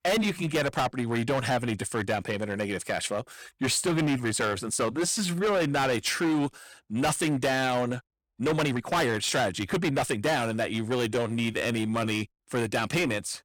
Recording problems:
distortion; heavy; 16% of the sound clipped
uneven, jittery; strongly; from 5 to 12 s

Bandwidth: 18 kHz